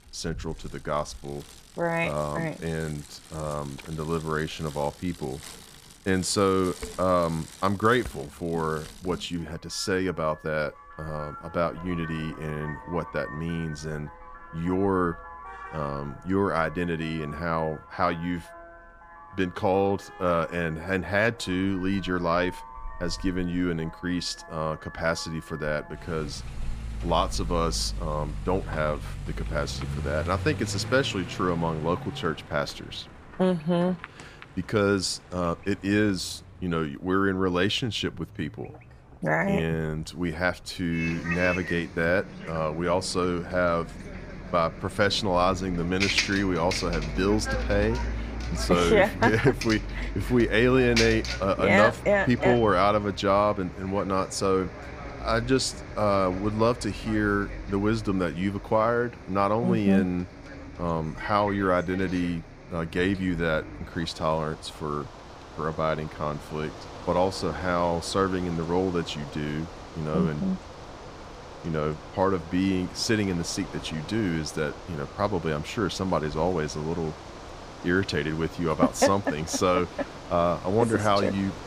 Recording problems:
traffic noise; noticeable; throughout; 10 dB below the speech

